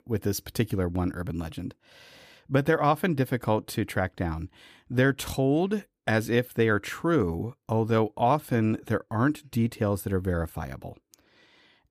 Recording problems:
none

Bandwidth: 15 kHz